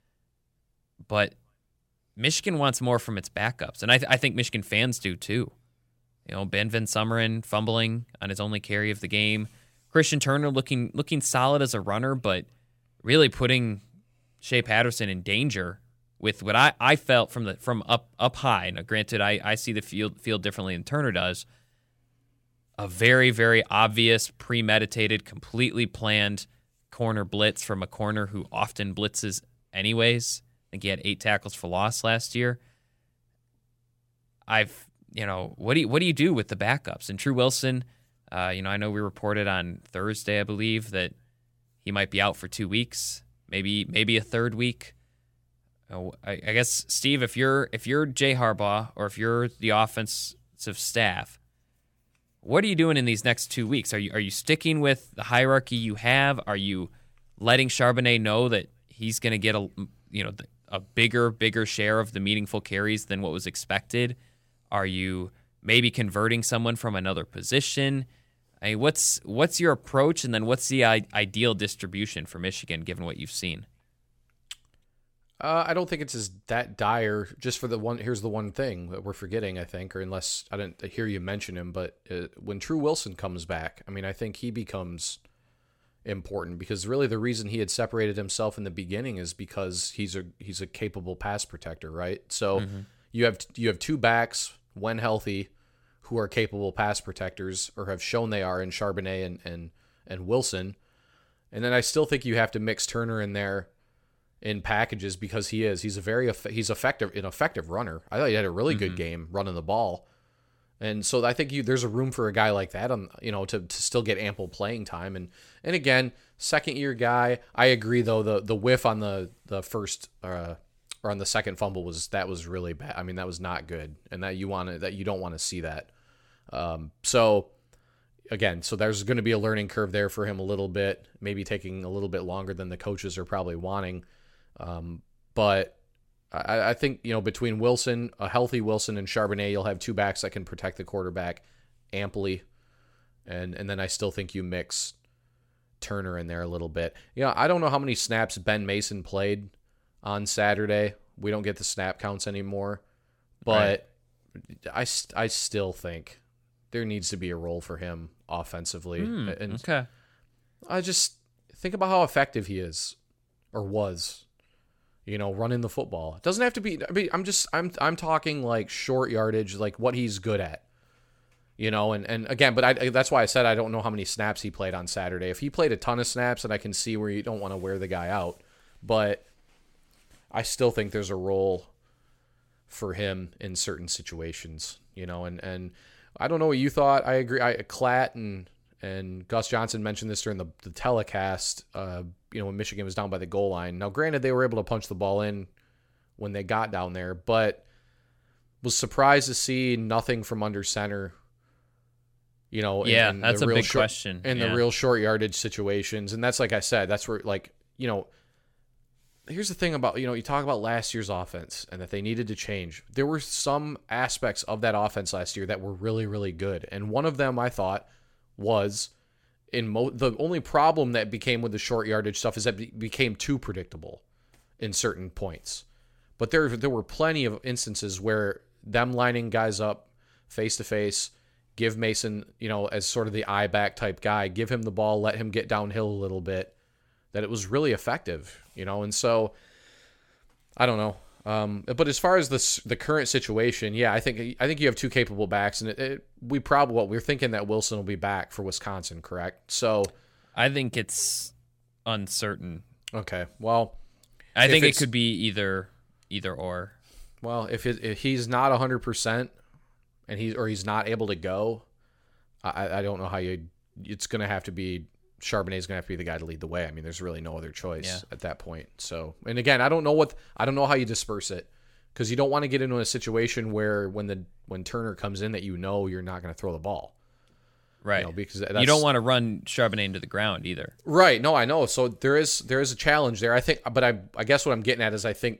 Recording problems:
none

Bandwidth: 17 kHz